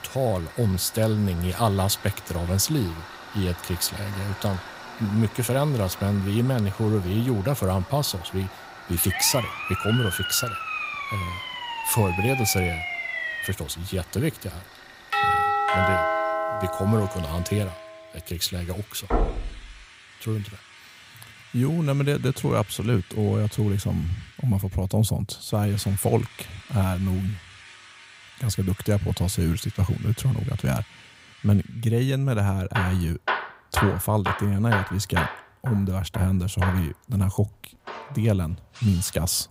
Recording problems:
machinery noise; noticeable; throughout; 15 dB below the speech
siren; noticeable; from 9 to 14 s; peak 2 dB below the speech
doorbell; loud; from 15 to 18 s; peak 5 dB above the speech
door banging; noticeable; at 19 s; peak 1 dB below the speech

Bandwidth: 15.5 kHz